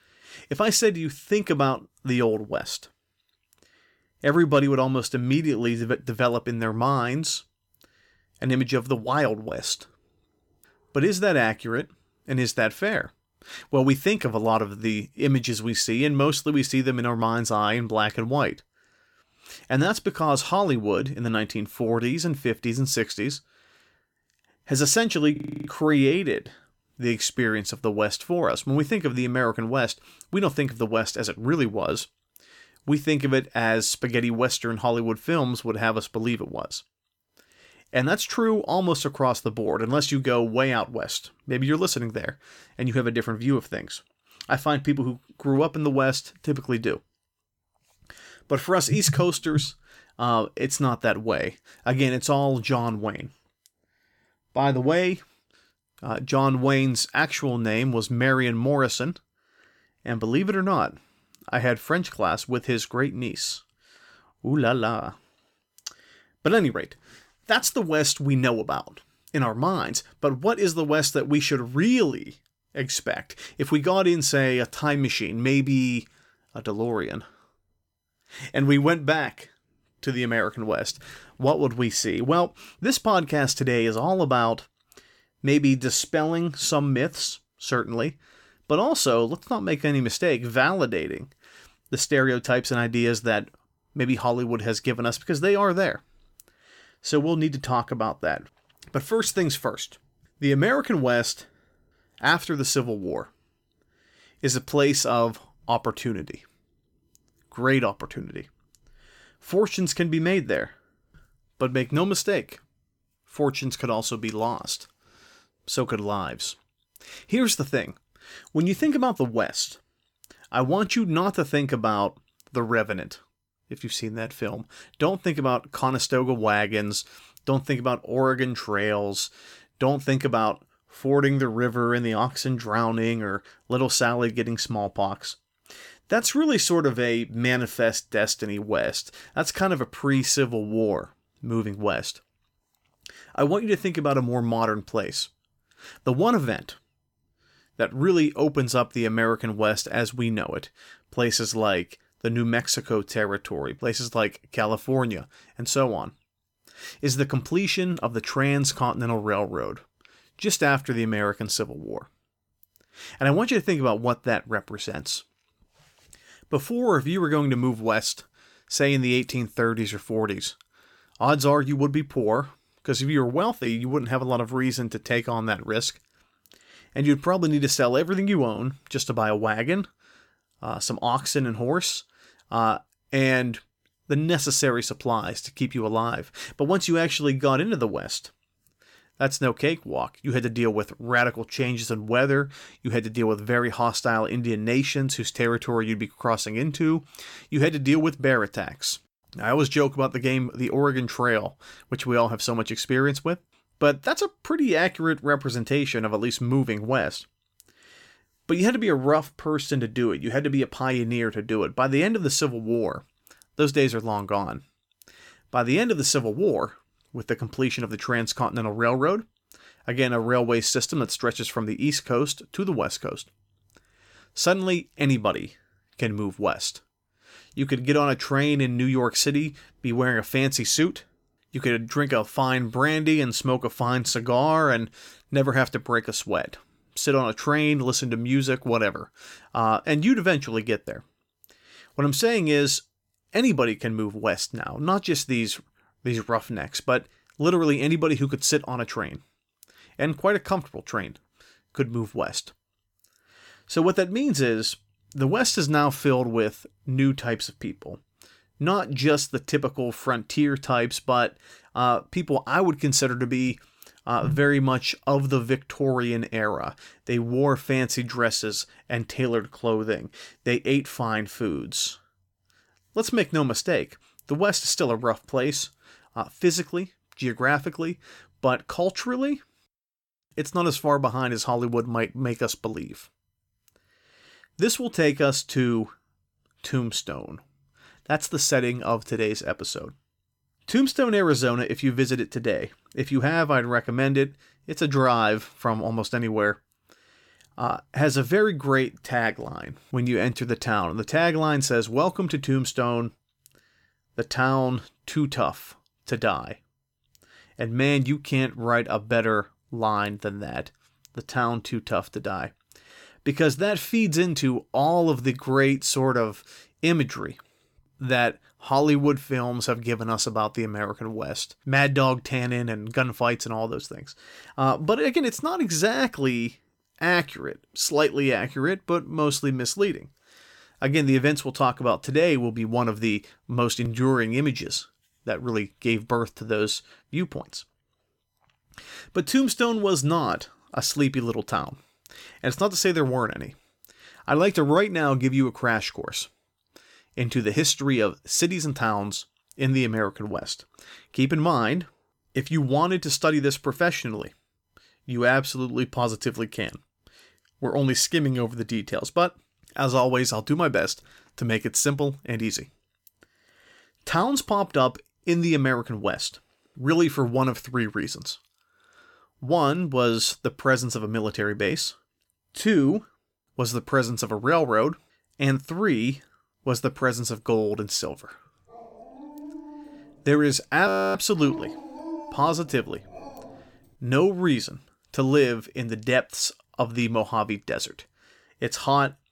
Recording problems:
audio freezing; at 25 s and at 6:21
dog barking; faint; from 6:19 to 6:24; peak 10 dB below the speech

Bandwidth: 17 kHz